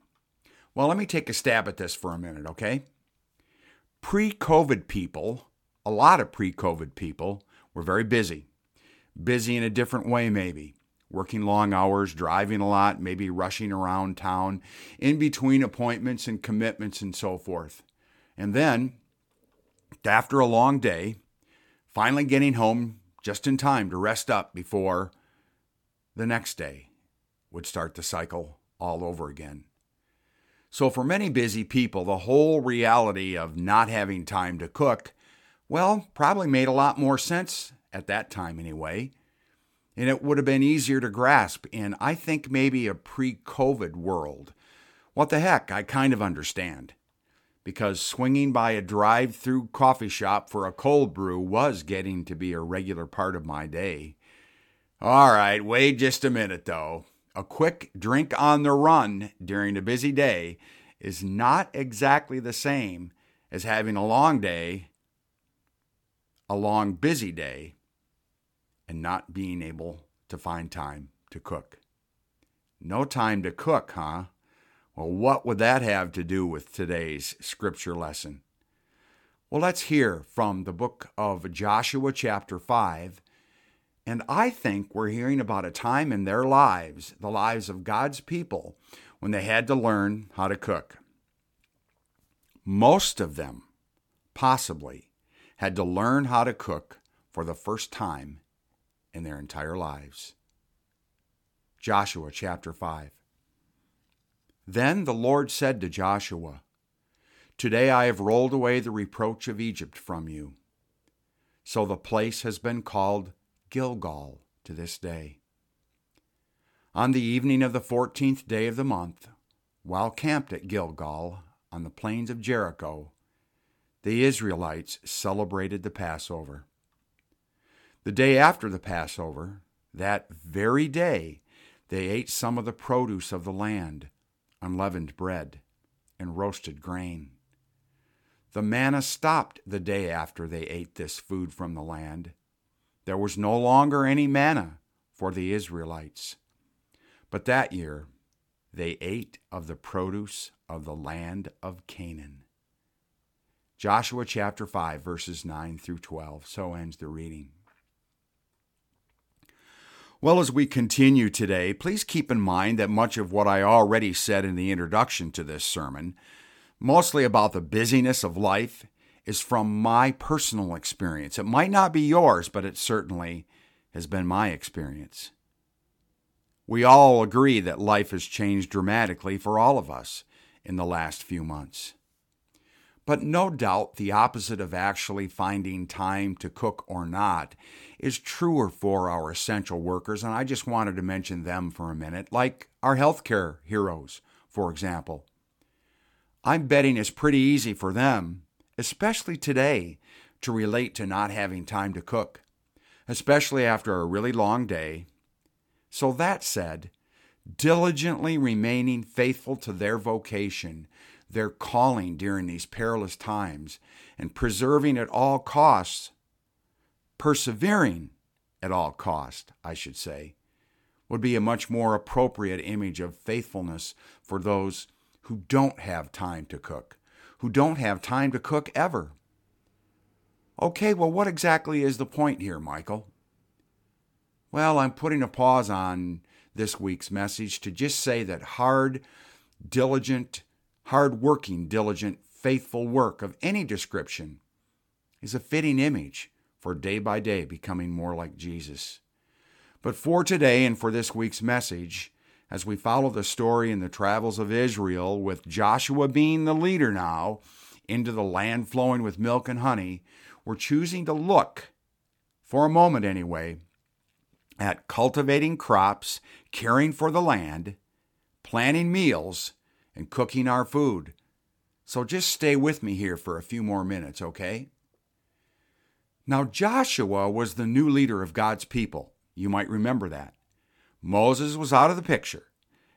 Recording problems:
none

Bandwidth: 17.5 kHz